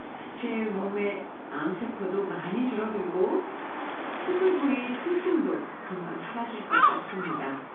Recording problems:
off-mic speech; far
room echo; noticeable; dies away in 0.4 s
phone-call audio
animal sounds; loud; throughout; 2 dB below the speech

